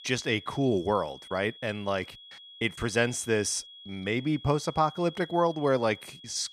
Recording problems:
high-pitched whine; noticeable; throughout; 3.5 kHz, 15 dB below the speech

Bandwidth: 14.5 kHz